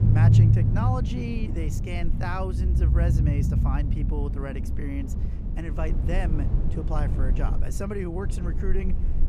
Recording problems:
low rumble; loud; throughout; 2 dB below the speech

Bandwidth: 15.5 kHz